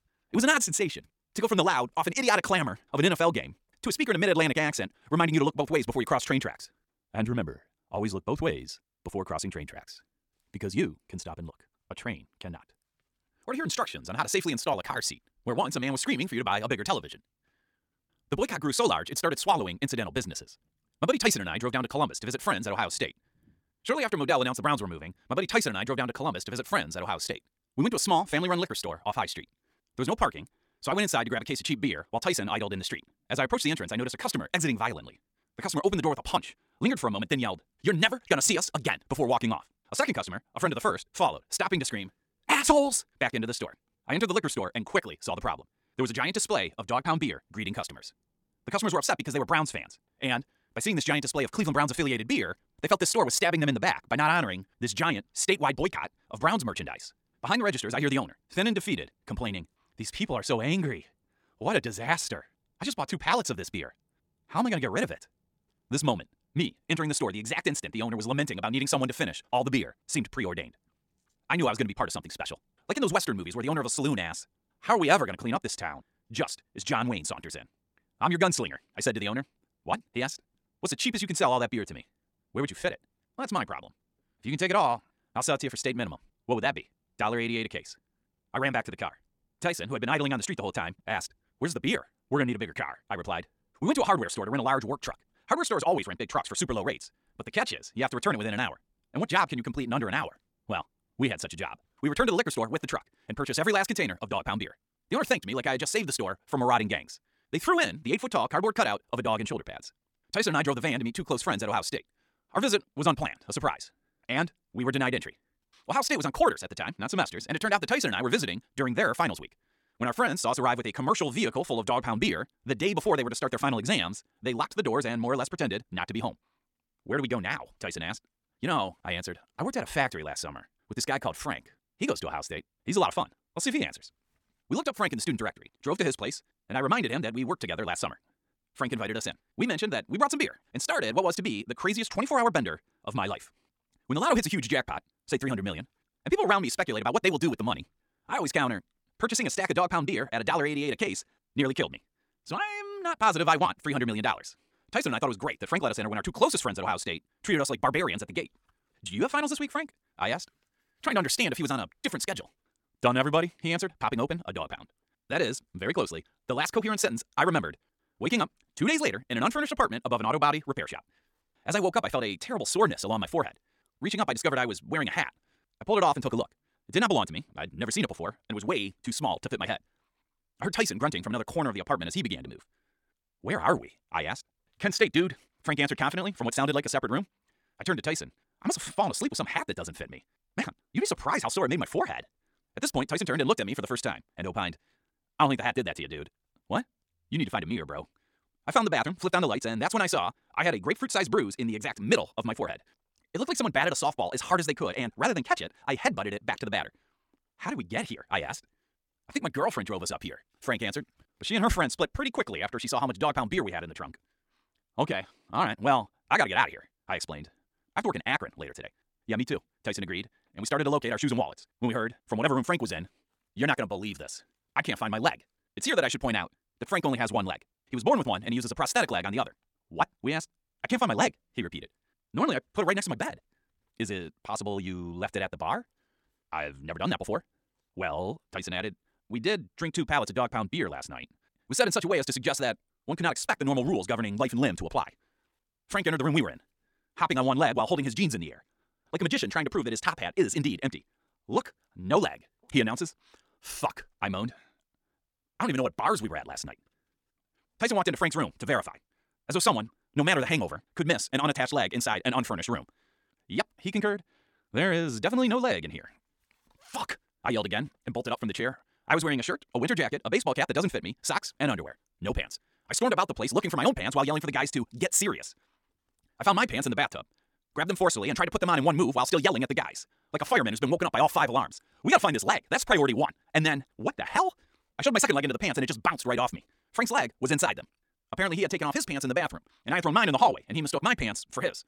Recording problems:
wrong speed, natural pitch; too fast; 1.7 times normal speed

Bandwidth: 17.5 kHz